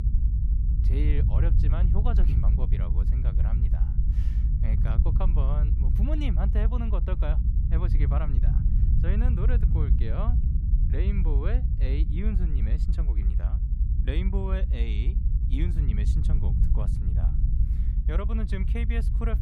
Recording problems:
low rumble; loud; throughout; 3 dB below the speech

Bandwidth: 15.5 kHz